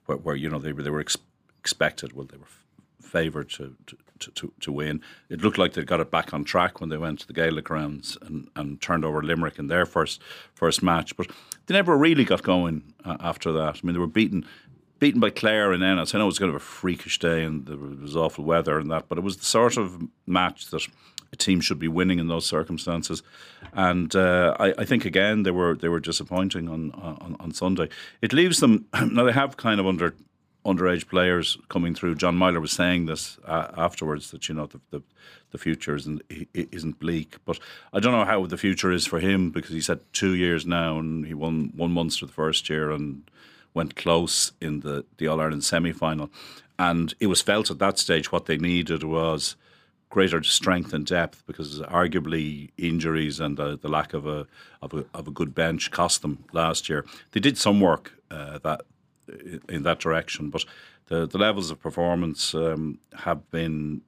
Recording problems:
none

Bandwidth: 15 kHz